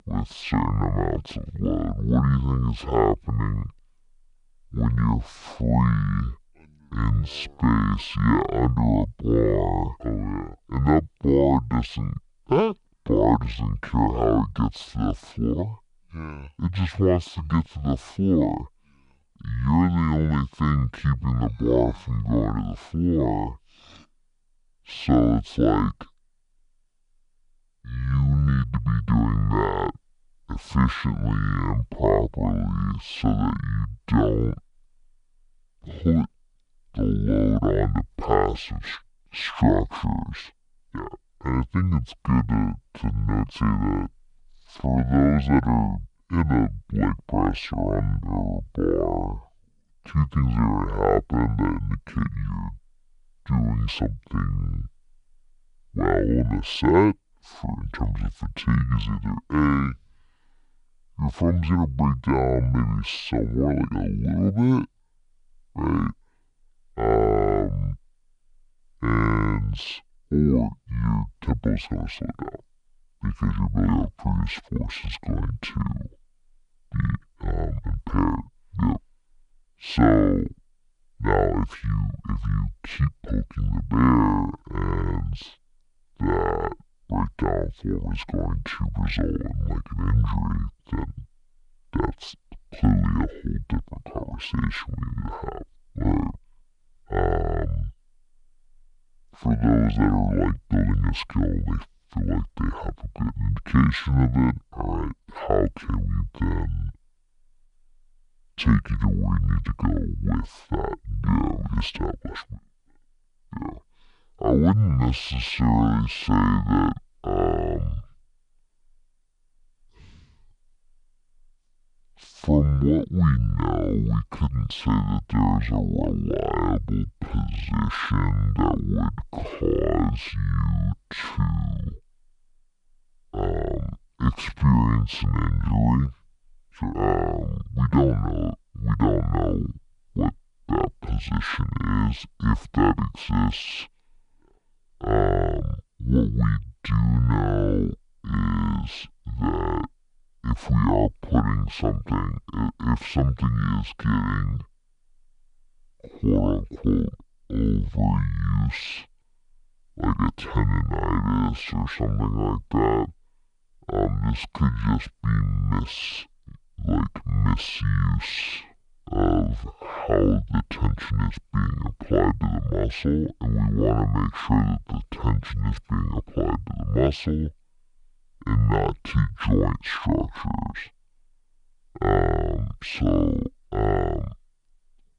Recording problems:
wrong speed and pitch; too slow and too low; 0.6 times normal speed

